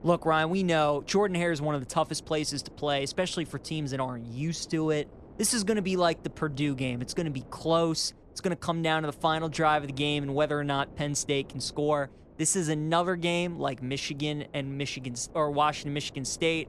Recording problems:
wind noise on the microphone; occasional gusts; 25 dB below the speech

